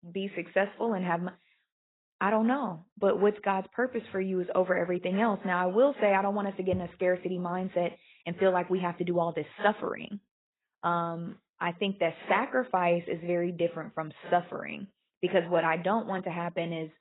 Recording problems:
garbled, watery; badly; nothing above 3 kHz

